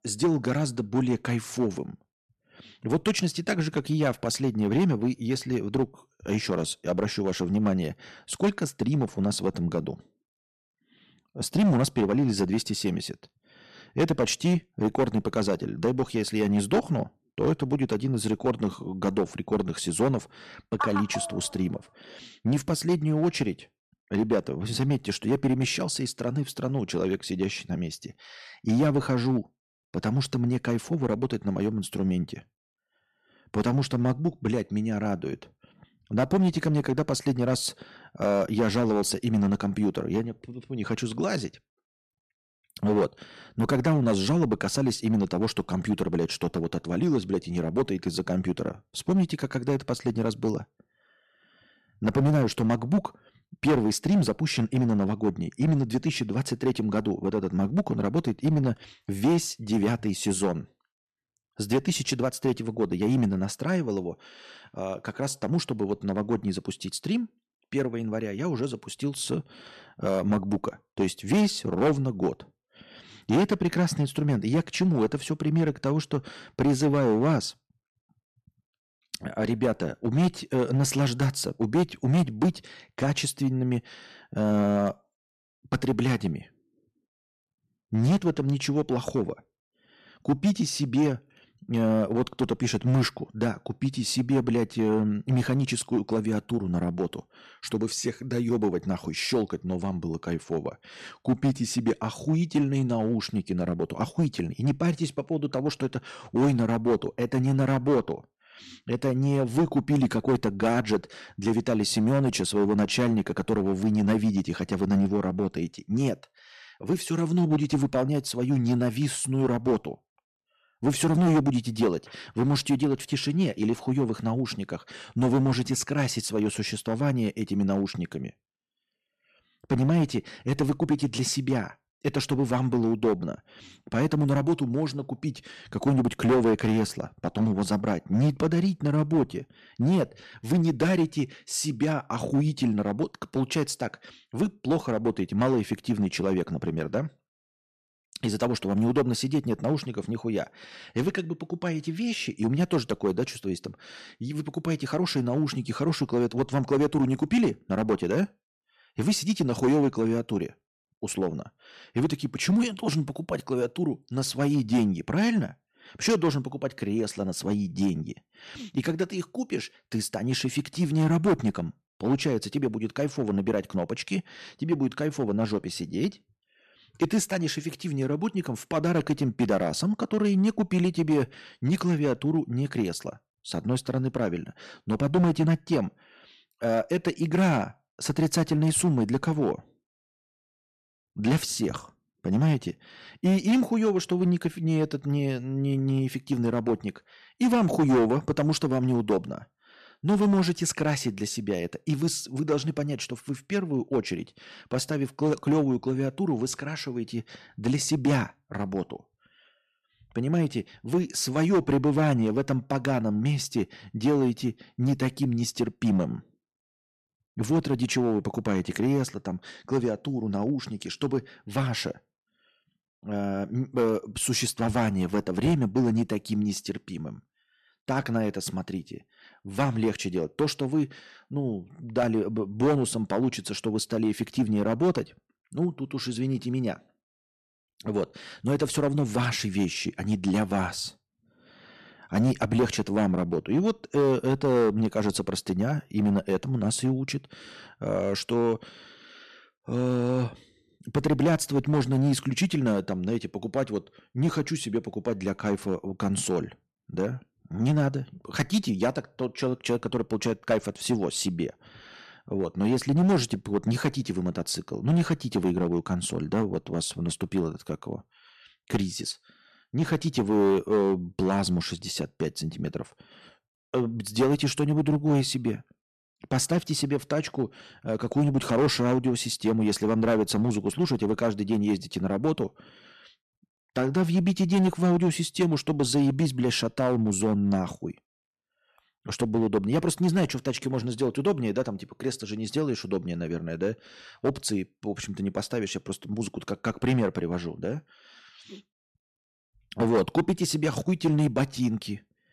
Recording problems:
distortion; slight; 4% of the sound clipped

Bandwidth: 13.5 kHz